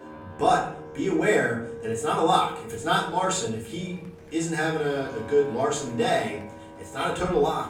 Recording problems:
off-mic speech; far
room echo; slight; dies away in 0.6 s
background music; noticeable; throughout; 15 dB below the speech
chatter from many people; faint; throughout; 25 dB below the speech

